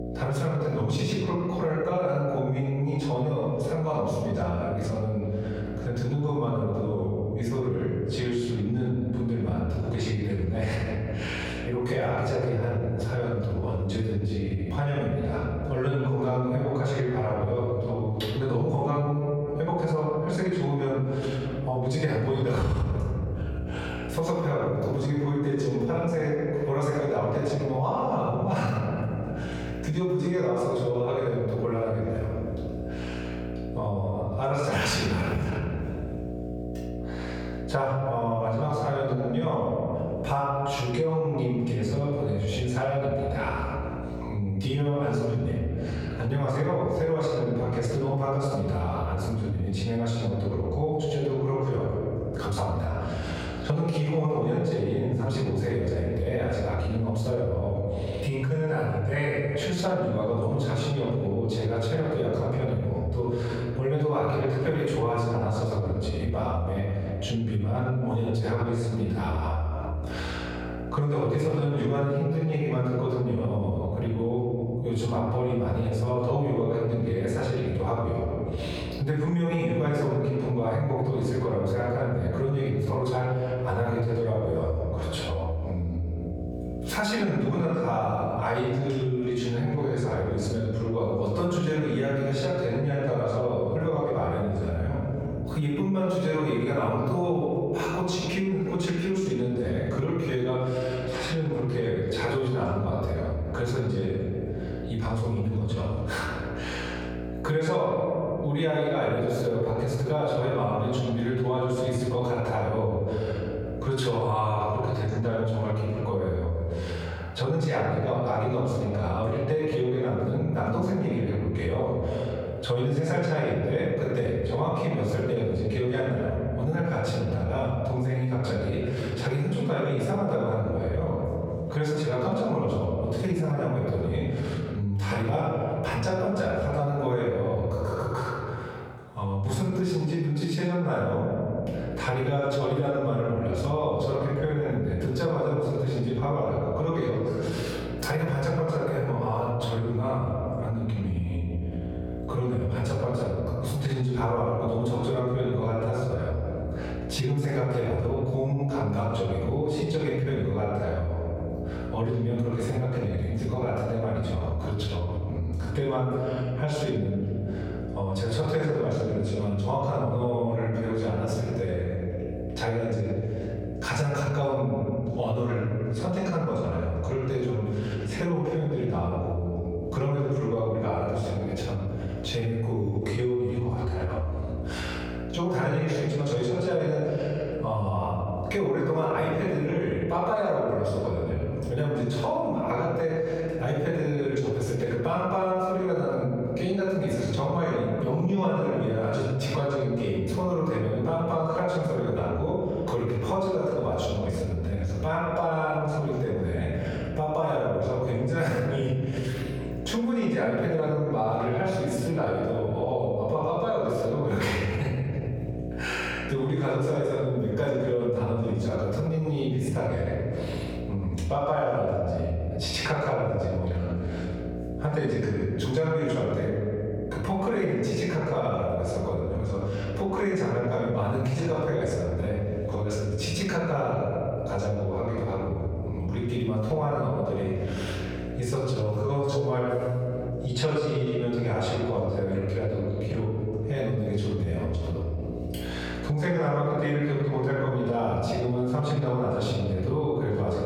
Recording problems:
off-mic speech; far
room echo; noticeable; dies away in 1.5 s
squashed, flat; somewhat
electrical hum; noticeable; until 1:56 and from 2:21 on; 60 Hz, 15 dB below the speech

